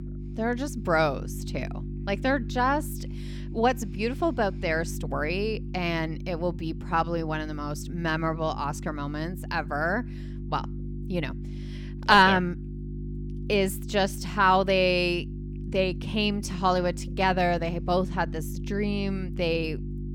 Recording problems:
electrical hum; noticeable; throughout; 50 Hz, 20 dB below the speech

